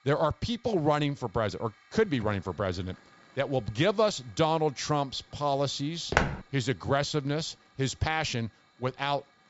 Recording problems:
high frequencies cut off; noticeable; nothing above 8 kHz
hiss; faint; throughout; 30 dB below the speech
footsteps; loud; at 6 s; peak 2 dB above the speech

